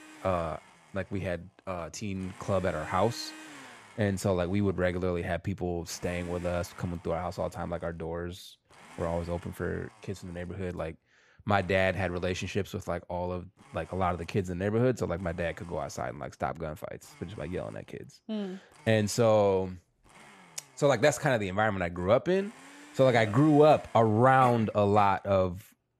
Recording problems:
household noises; faint; throughout; 25 dB below the speech

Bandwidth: 14.5 kHz